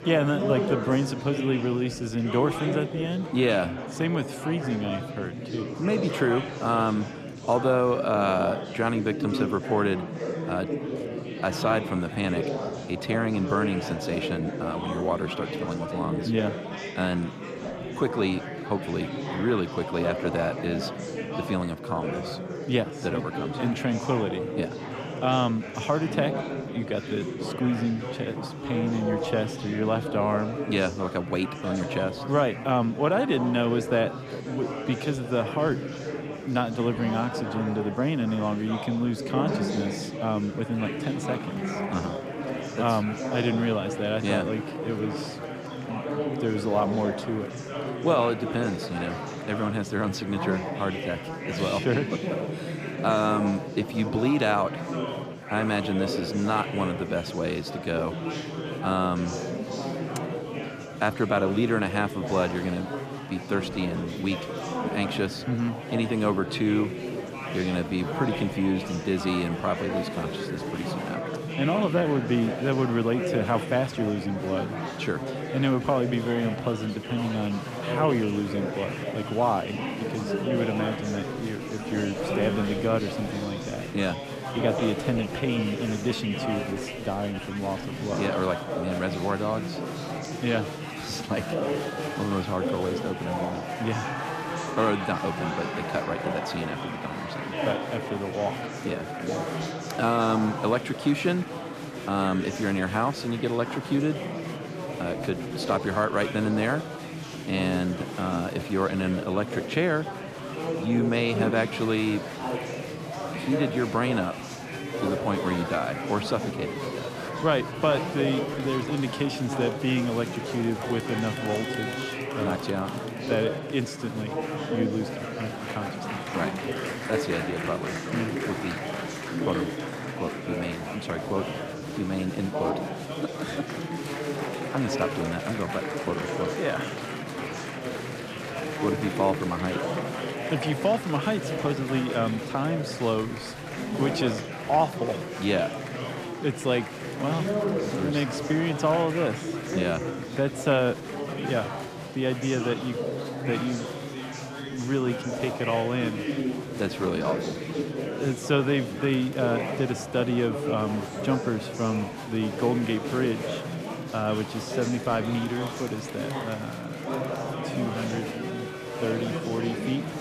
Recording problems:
murmuring crowd; loud; throughout; 4 dB below the speech

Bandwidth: 14.5 kHz